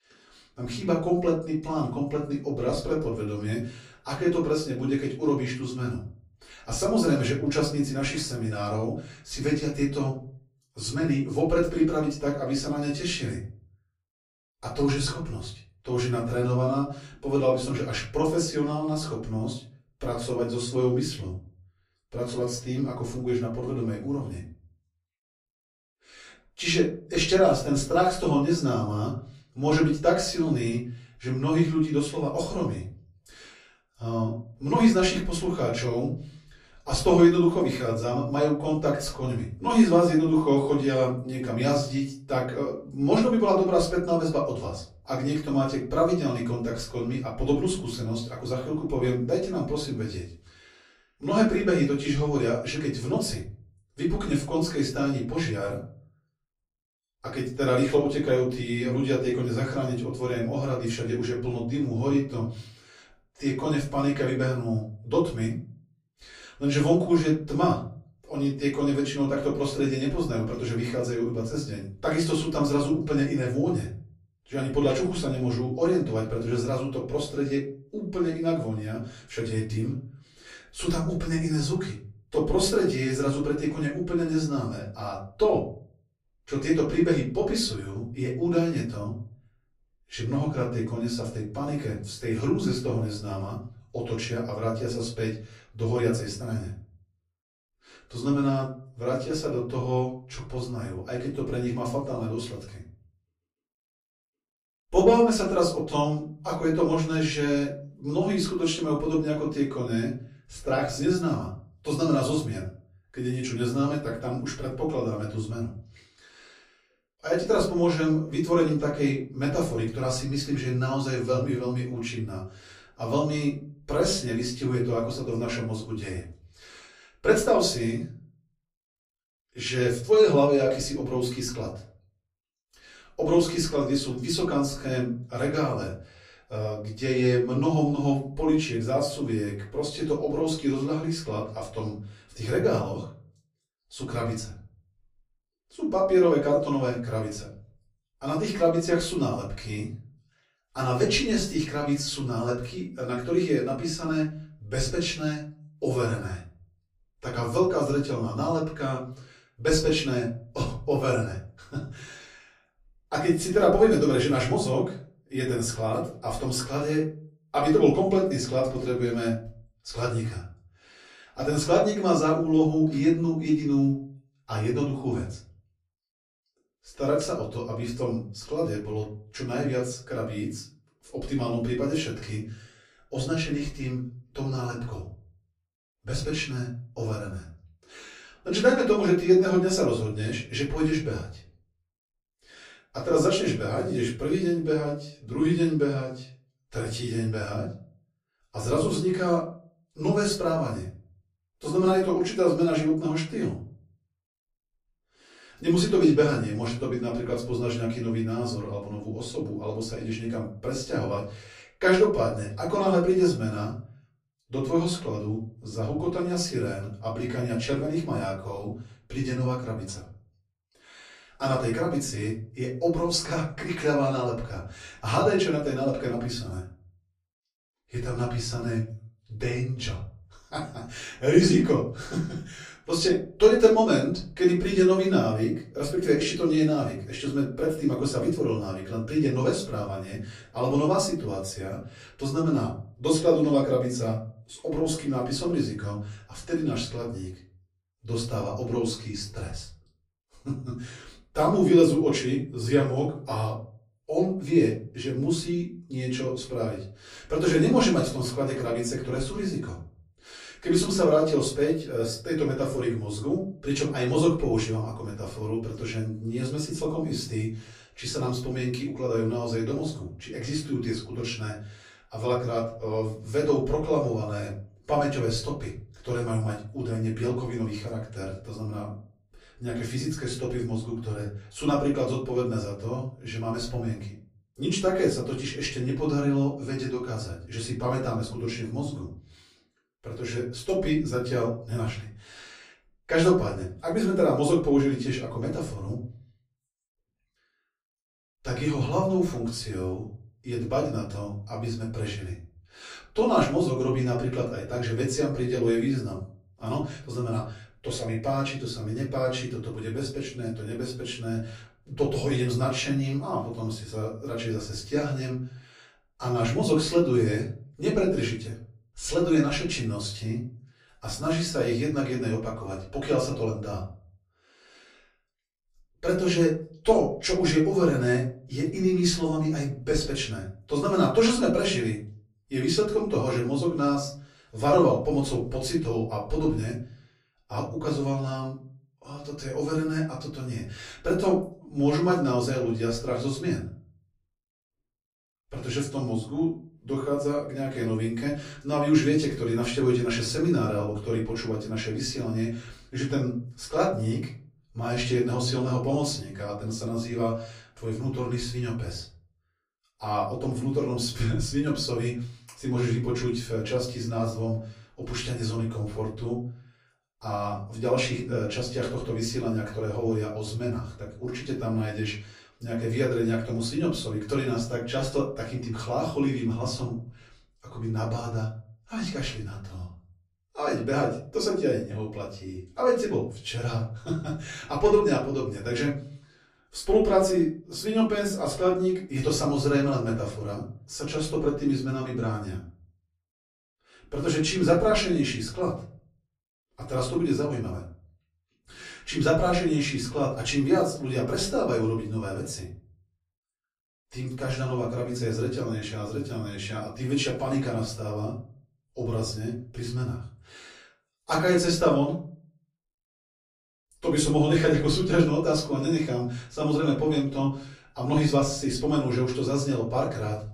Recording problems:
off-mic speech; far
room echo; slight; dies away in 0.5 s

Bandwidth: 15 kHz